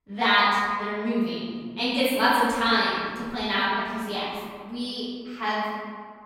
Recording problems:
room echo; strong; dies away in 1.6 s
off-mic speech; far

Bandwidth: 16.5 kHz